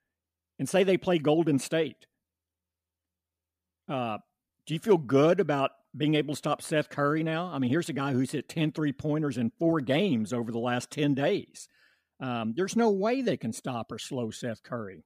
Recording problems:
none

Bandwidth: 15 kHz